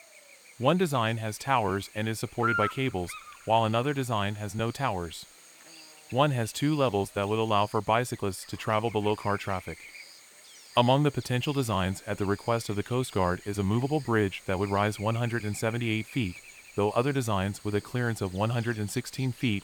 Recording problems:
electrical hum; noticeable; throughout; 60 Hz, 10 dB below the speech

